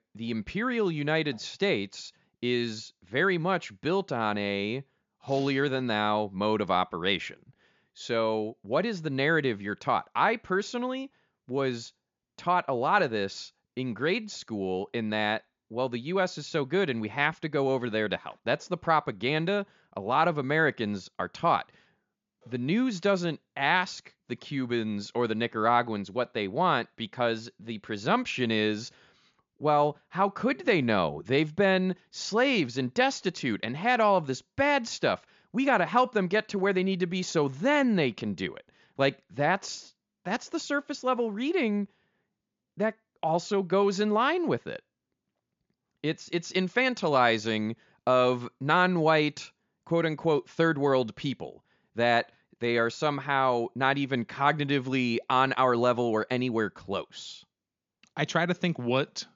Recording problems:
high frequencies cut off; noticeable; nothing above 7 kHz

